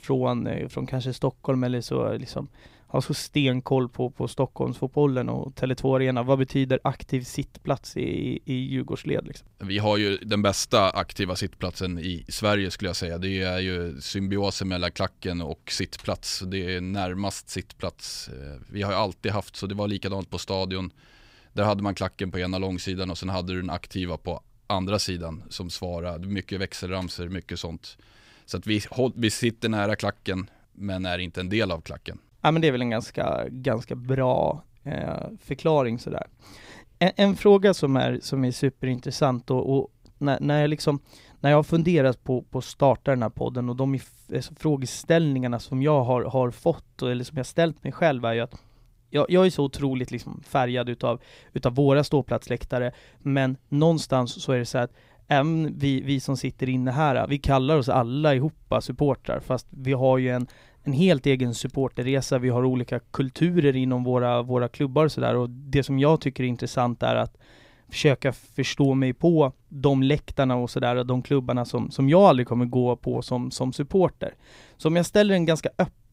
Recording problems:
none

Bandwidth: 15.5 kHz